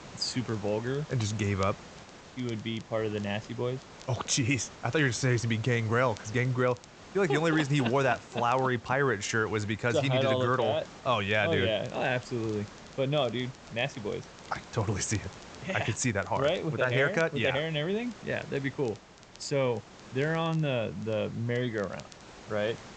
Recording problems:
high frequencies cut off; noticeable; nothing above 8 kHz
hiss; noticeable; throughout; 20 dB below the speech
crackle, like an old record; faint; 25 dB below the speech

